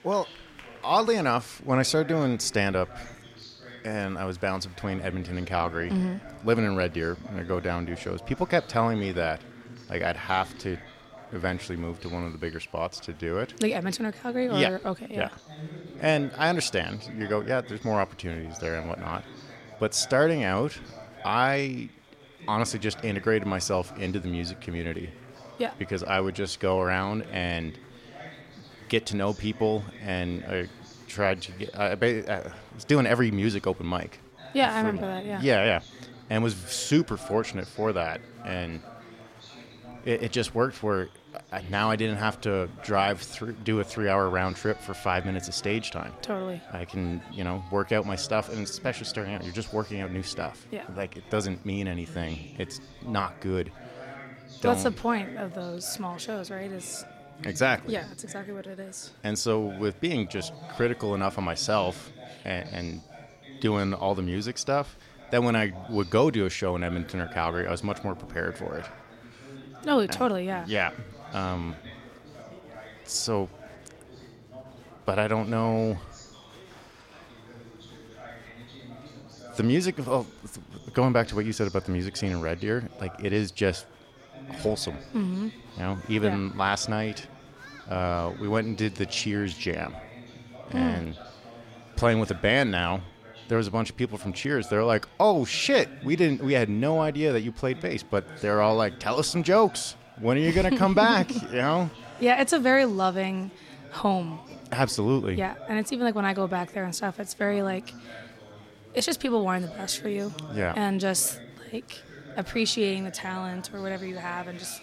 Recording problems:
chatter from many people; noticeable; throughout; 20 dB below the speech

